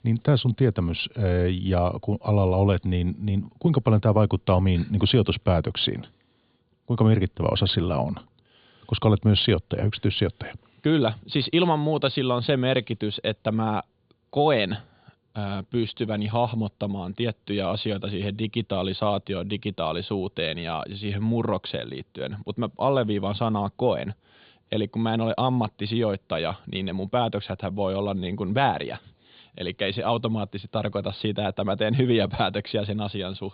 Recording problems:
high frequencies cut off; severe; nothing above 4.5 kHz

